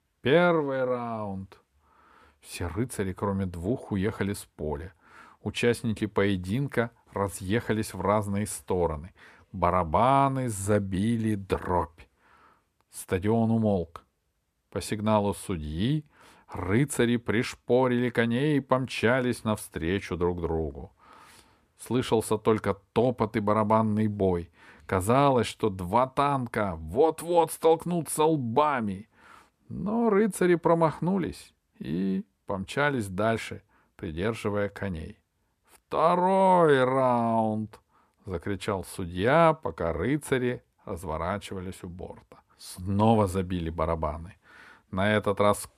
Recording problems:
none

